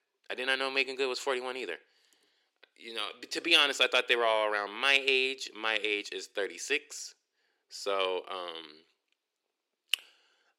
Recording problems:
thin; somewhat; fading below 350 Hz

